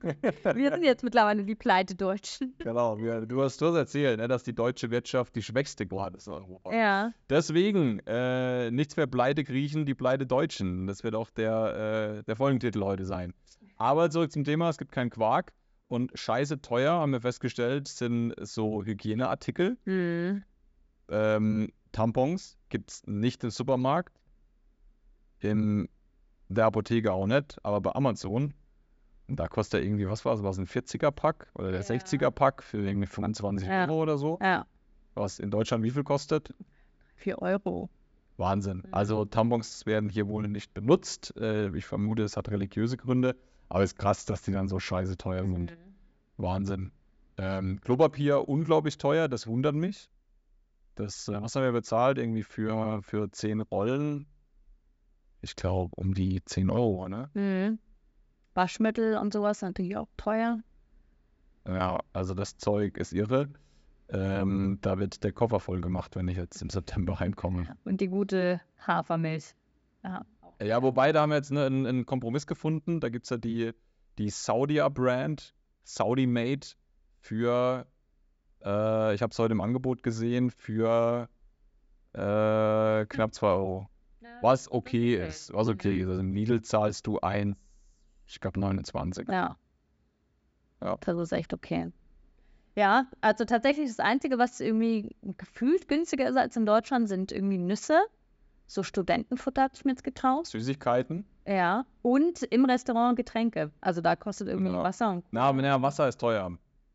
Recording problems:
high frequencies cut off; noticeable; nothing above 8 kHz

